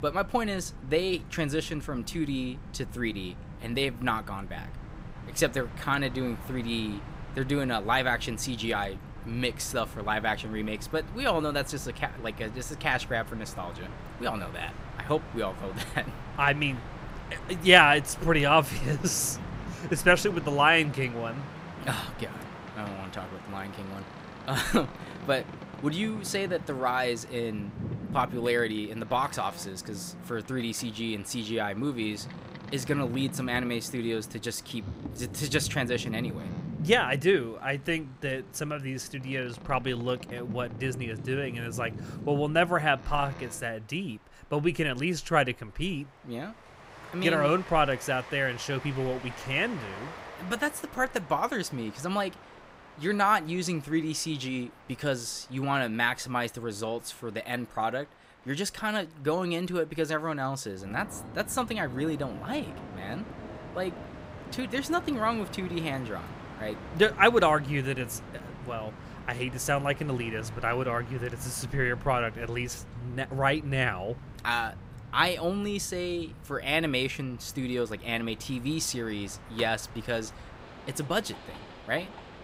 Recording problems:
train or aircraft noise; noticeable; throughout; 15 dB below the speech

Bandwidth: 15.5 kHz